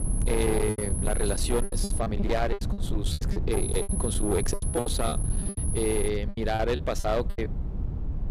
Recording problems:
distortion; slight; 16% of the sound clipped
high-pitched whine; loud; until 2 s and from 3.5 to 6 s; 10.5 kHz, 4 dB below the speech
low rumble; noticeable; throughout; 10 dB below the speech
choppy; very; 17% of the speech affected

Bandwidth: 15 kHz